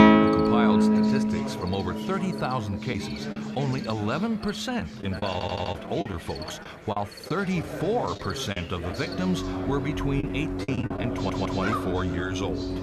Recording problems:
background music; very loud; throughout; 3 dB above the speech
background chatter; loud; throughout; 4 voices, 8 dB below the speech
animal sounds; noticeable; throughout; 10 dB below the speech
choppy; very; at 3 s, from 5 to 9 s and at 10 s; 10% of the speech affected
audio stuttering; at 5.5 s and at 11 s

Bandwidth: 13.5 kHz